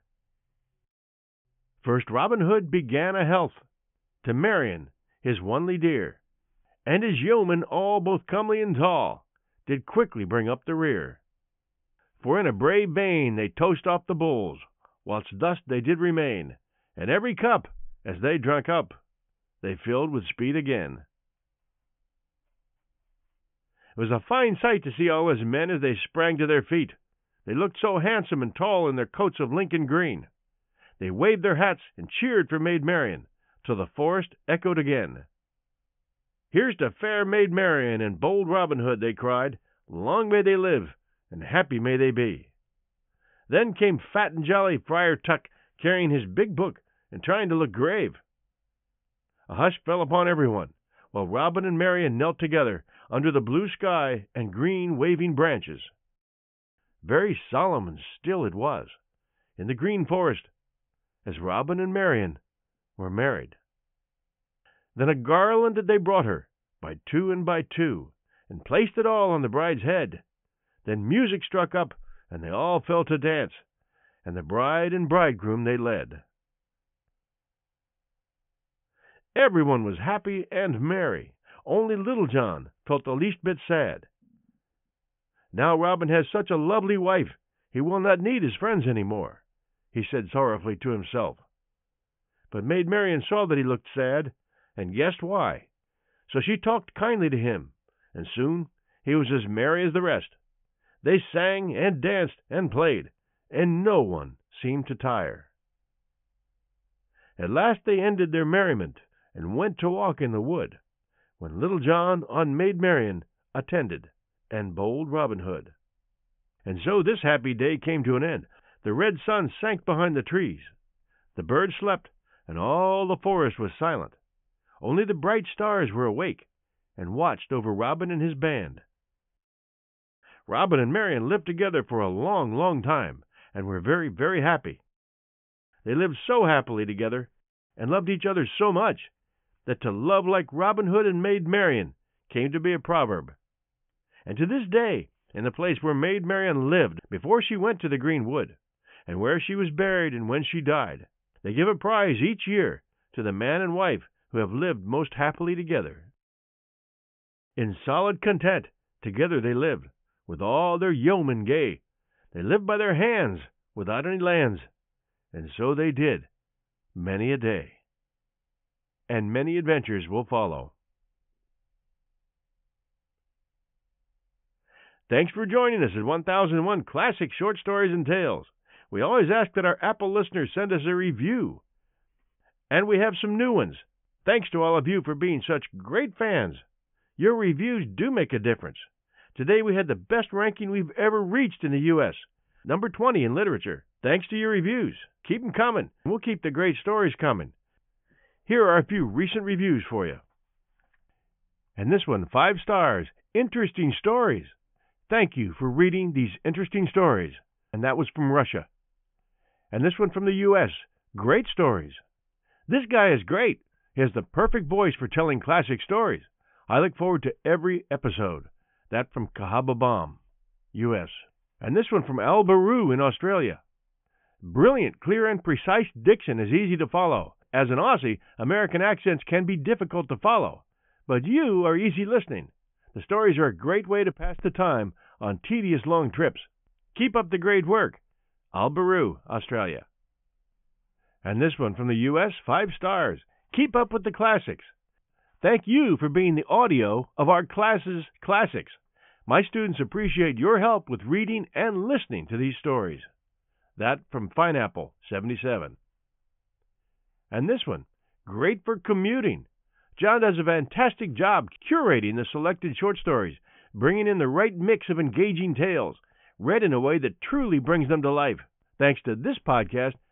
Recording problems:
high frequencies cut off; severe; nothing above 3.5 kHz

